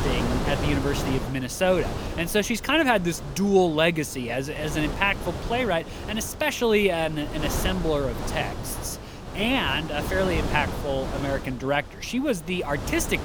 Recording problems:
wind noise on the microphone; heavy; 10 dB below the speech

